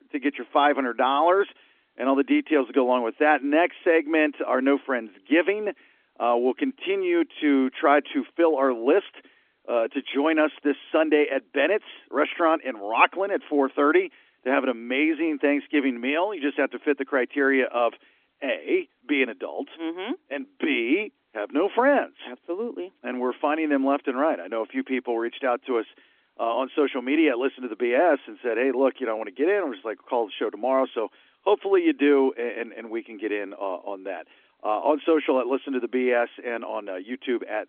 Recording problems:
phone-call audio; nothing above 3.5 kHz

